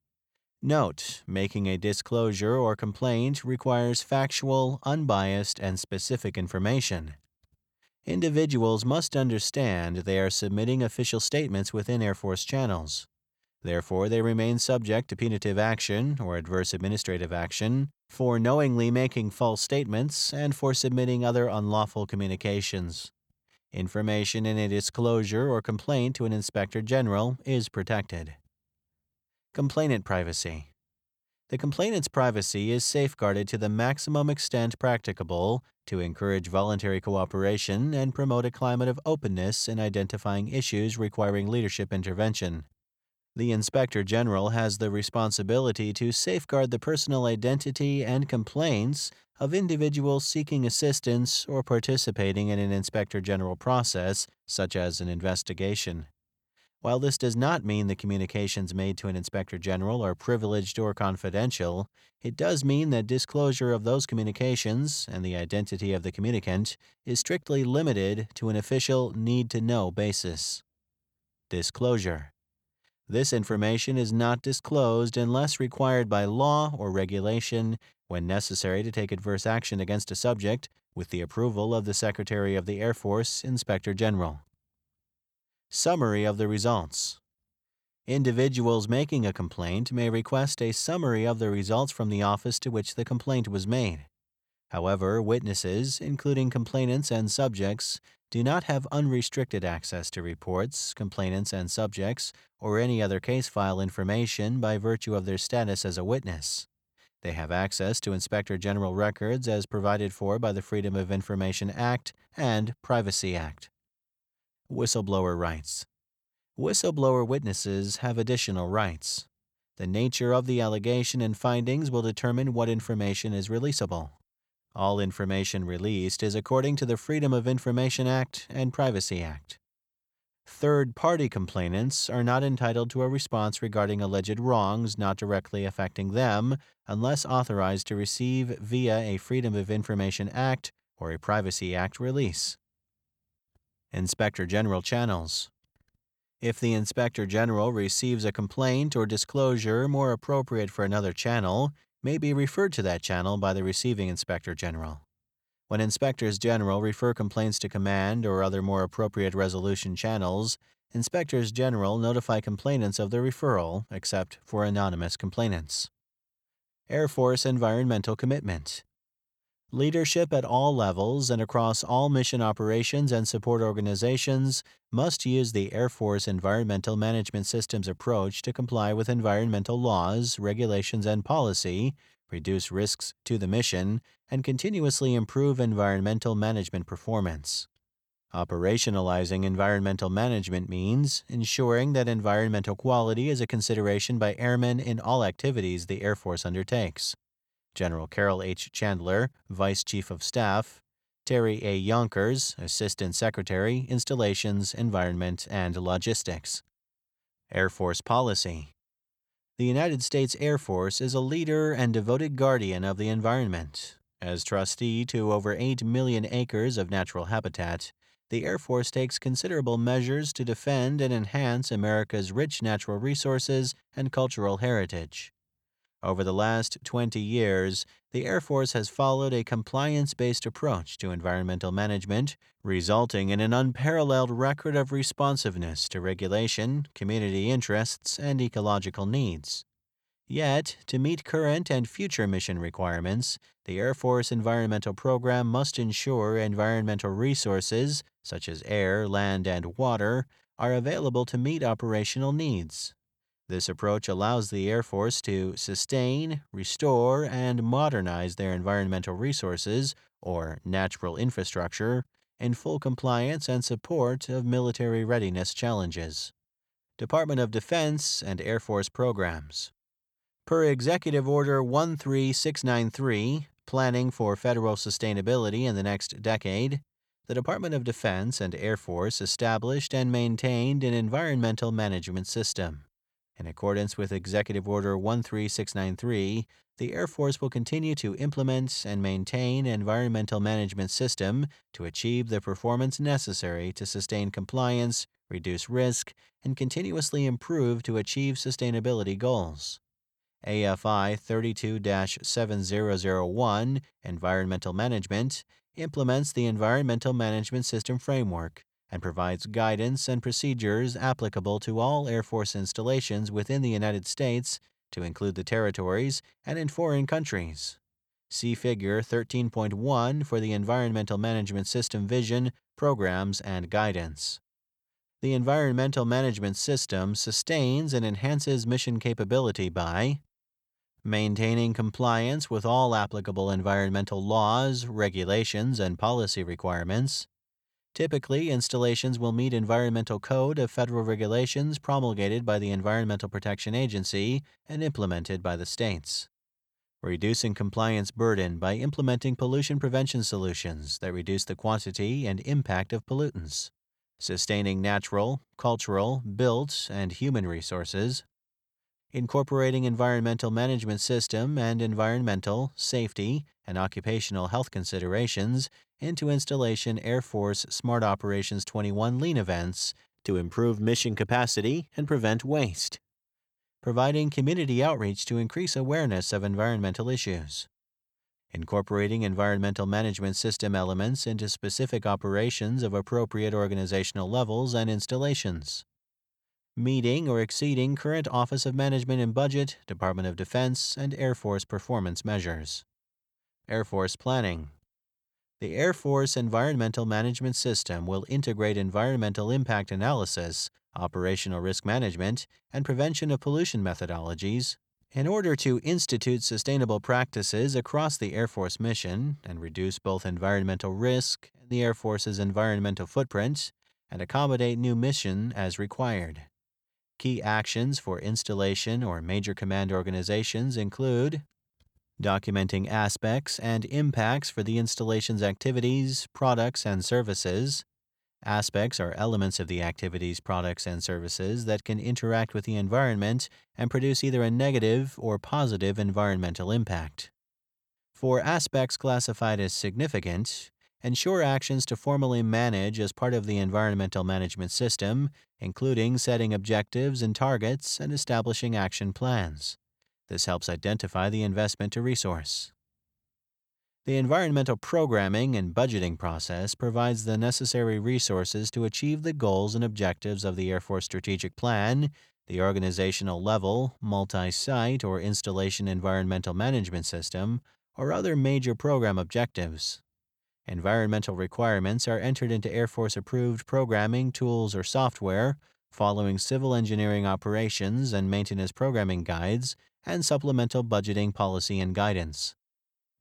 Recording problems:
none

